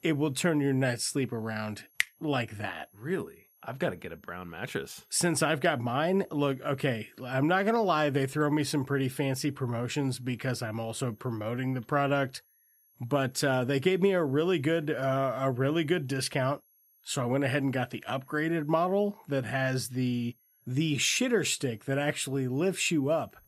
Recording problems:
high-pitched whine; faint; throughout; 11.5 kHz, 35 dB below the speech

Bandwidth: 14.5 kHz